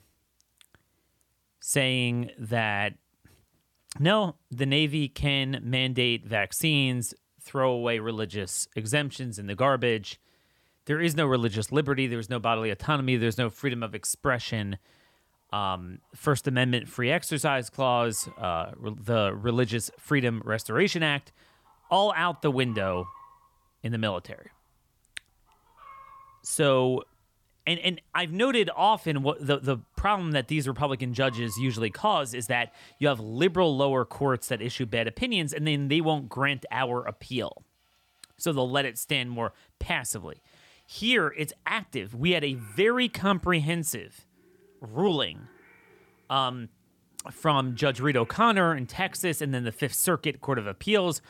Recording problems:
animal sounds; faint; throughout; 30 dB below the speech

